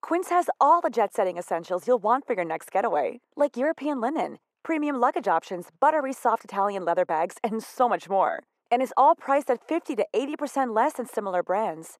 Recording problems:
muffled; very; fading above 1.5 kHz
thin; somewhat; fading below 500 Hz

